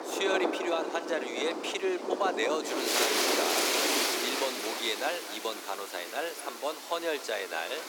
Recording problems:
thin; very; fading below 300 Hz
echo of what is said; noticeable; throughout; 240 ms later, 15 dB below the speech
rain or running water; very loud; throughout; 3 dB above the speech

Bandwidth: 18 kHz